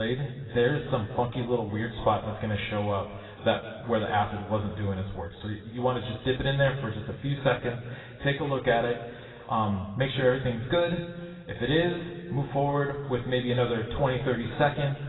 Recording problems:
garbled, watery; badly; nothing above 4 kHz
room echo; slight; dies away in 1.5 s
off-mic speech; somewhat distant
abrupt cut into speech; at the start

